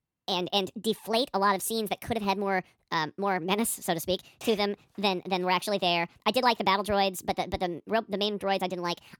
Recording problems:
wrong speed and pitch; too fast and too high; 1.5 times normal speed

